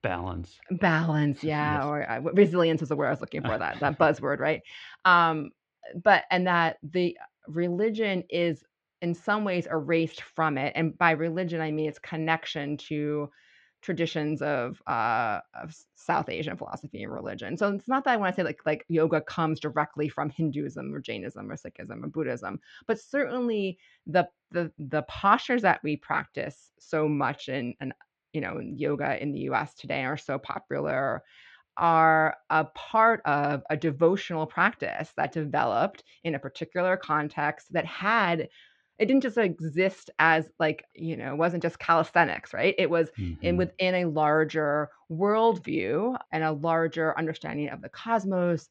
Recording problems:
muffled; slightly; fading above 4 kHz

